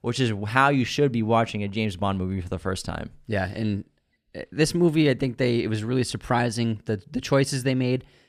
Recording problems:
none

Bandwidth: 14.5 kHz